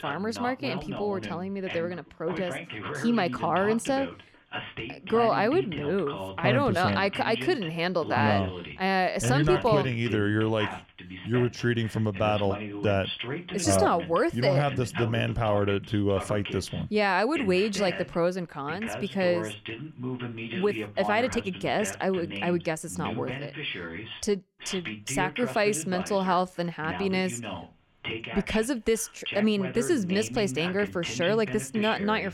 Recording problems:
voice in the background; loud; throughout; 9 dB below the speech

